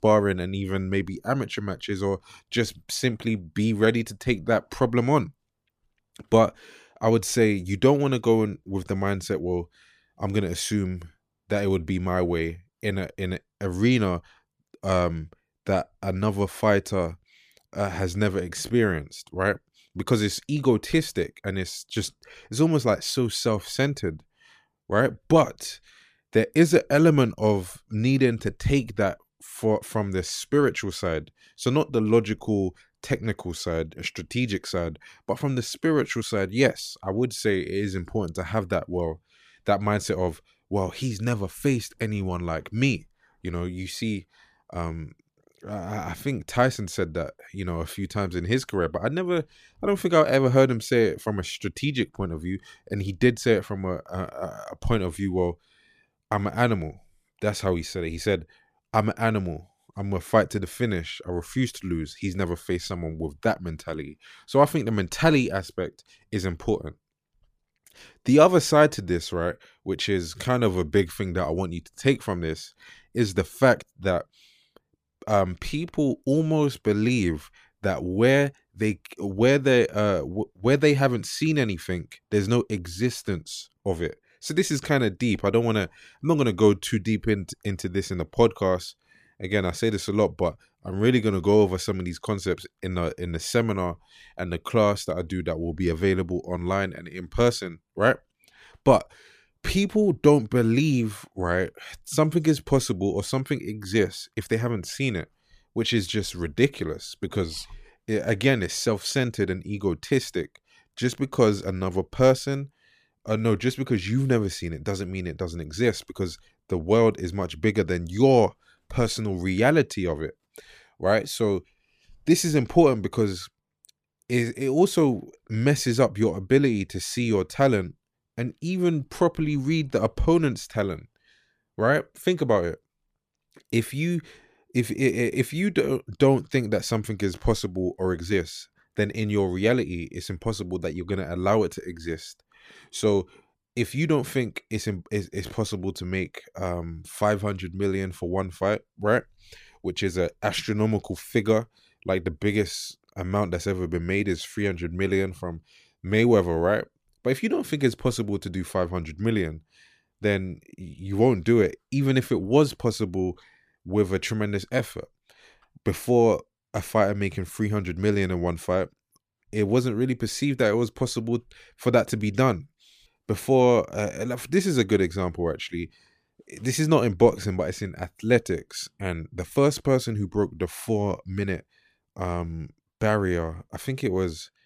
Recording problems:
none

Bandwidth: 15 kHz